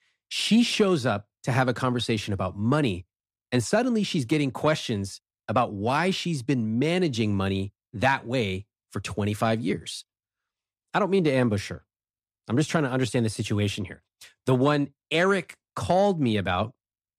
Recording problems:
none

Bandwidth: 15 kHz